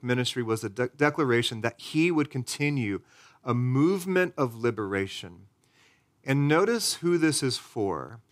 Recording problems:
none

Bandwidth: 15.5 kHz